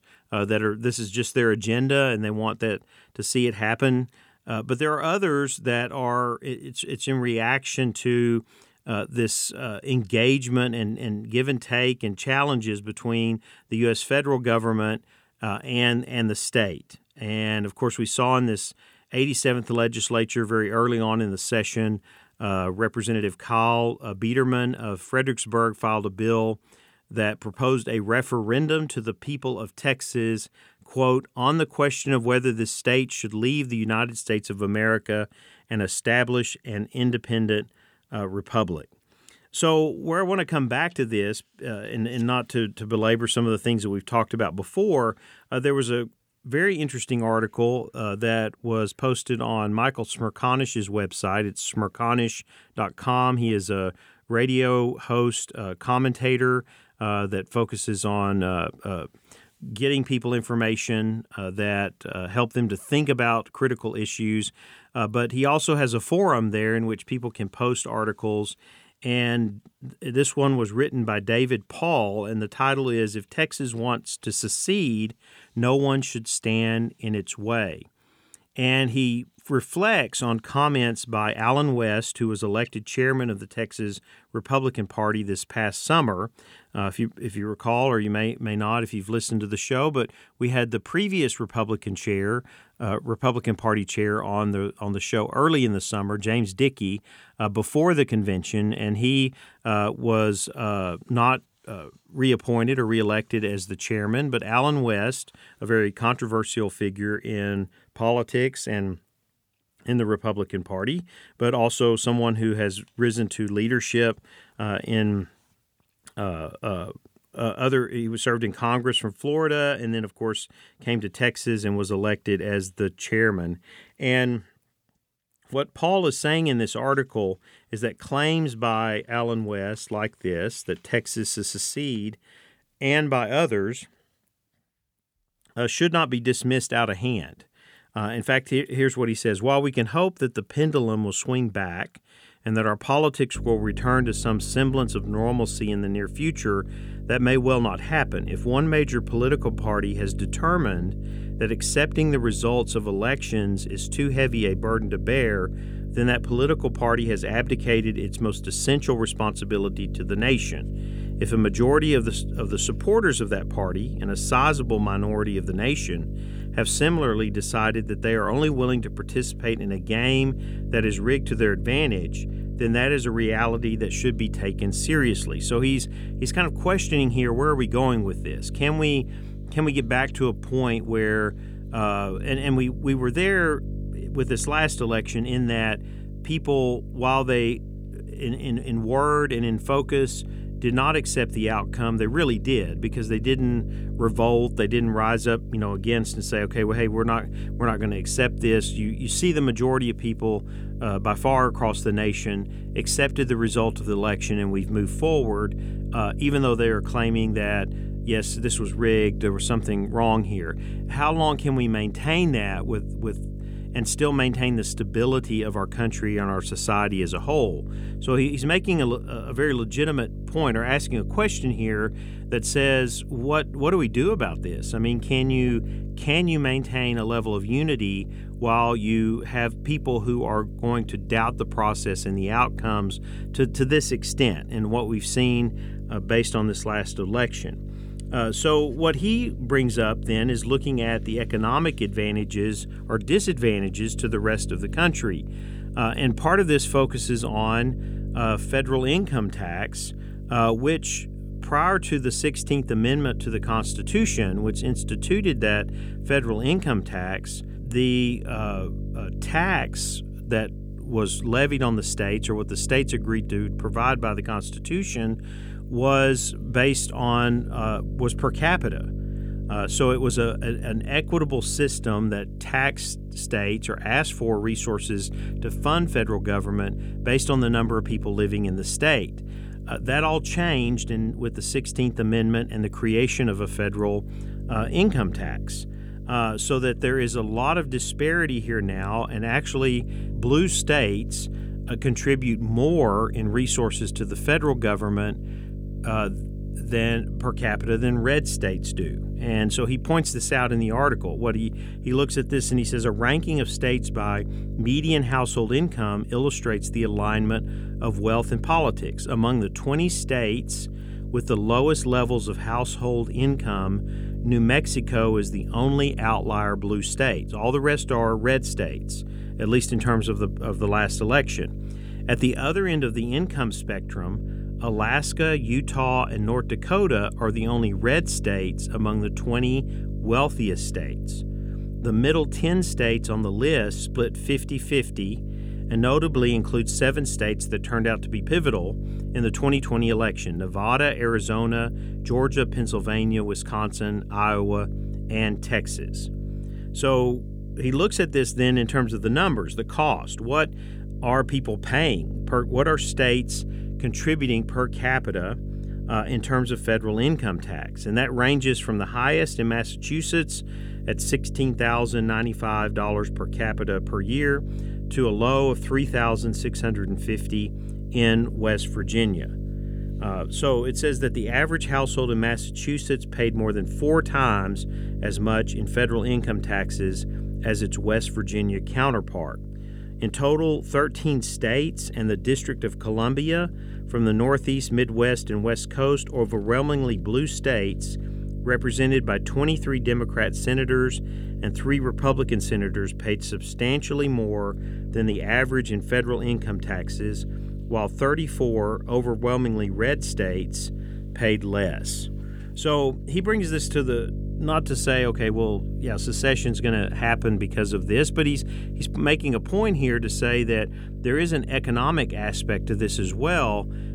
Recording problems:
electrical hum; noticeable; from 2:23 on; 50 Hz, 20 dB below the speech

